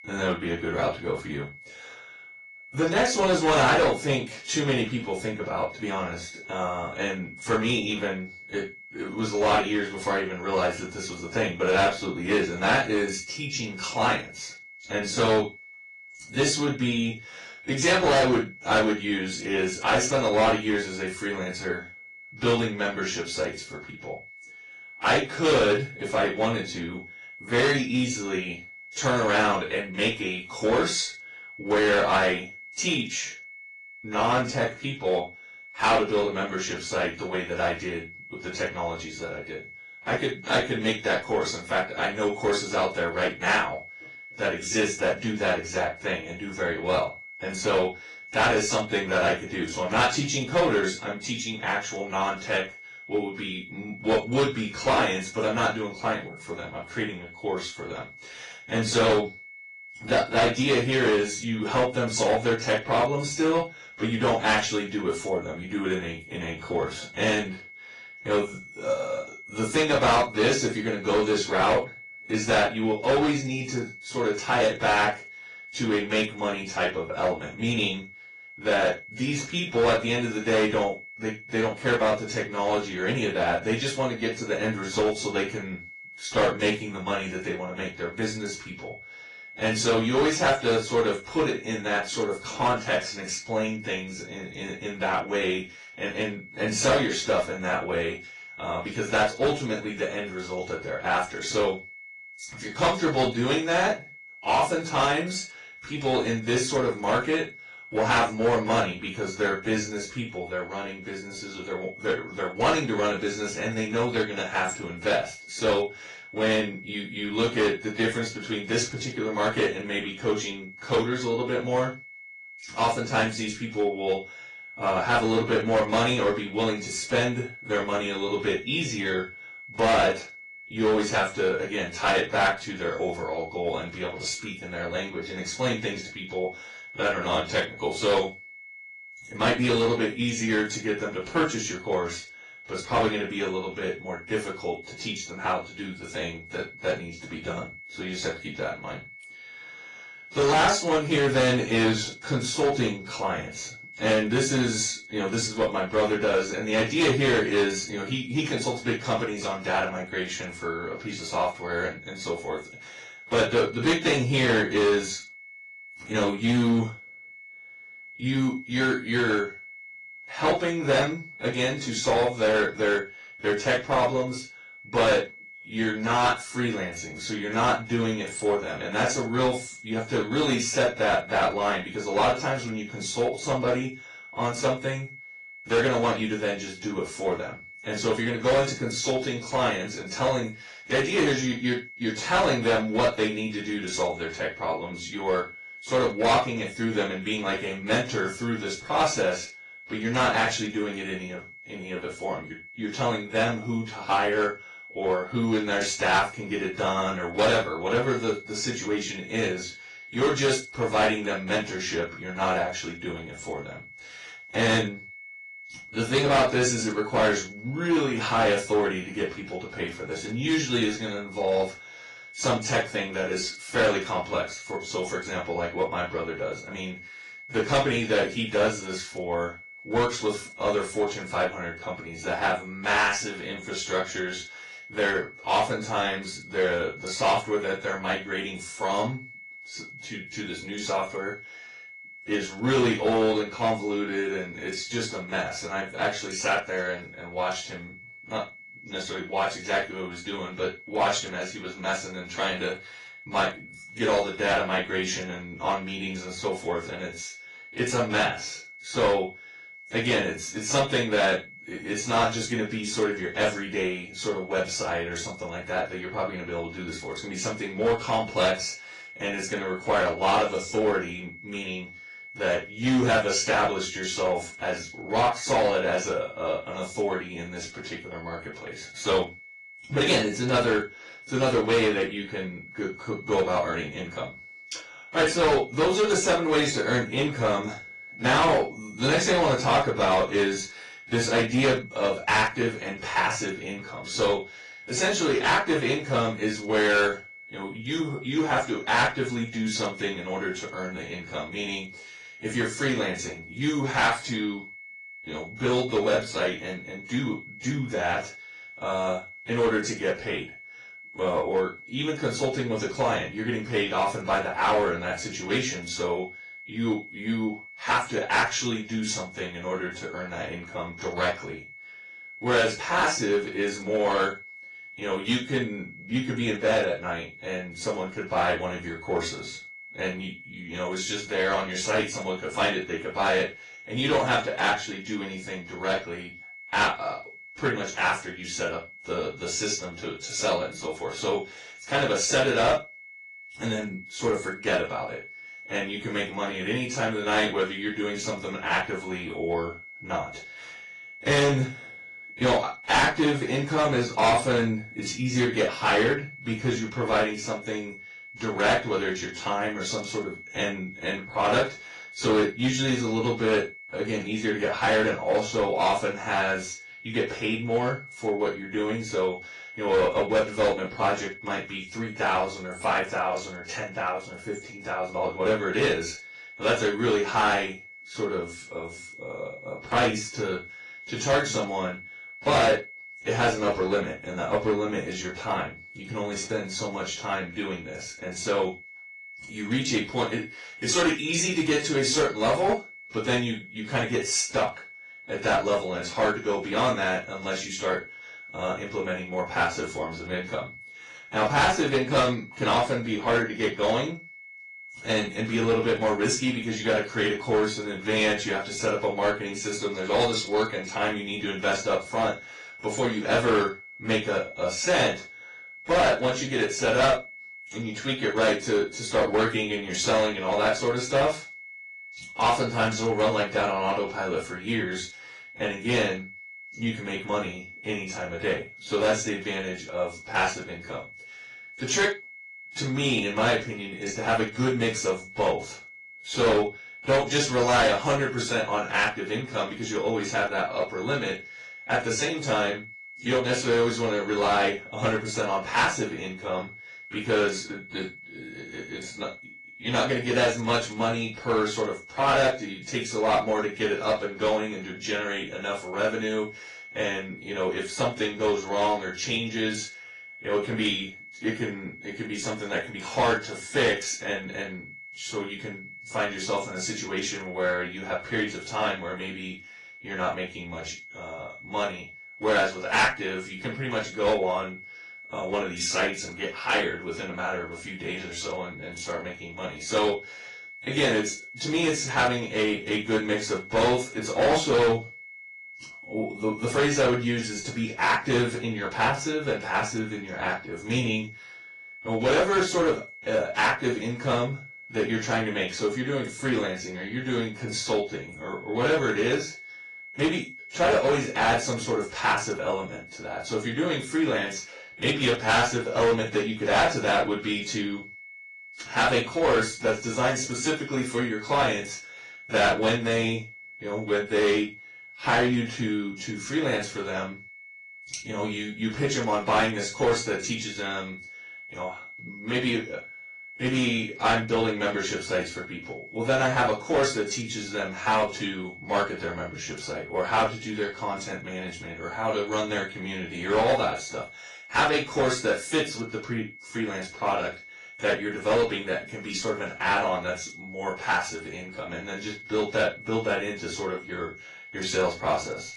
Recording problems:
off-mic speech; far
room echo; noticeable; dies away in 0.2 s
distortion; slight; 4% of the sound clipped
garbled, watery; slightly; nothing above 10 kHz
high-pitched whine; noticeable; throughout; 2 kHz, 15 dB below the speech

